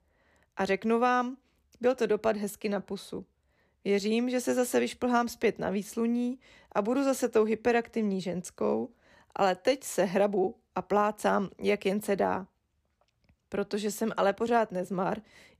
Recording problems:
none

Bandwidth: 14.5 kHz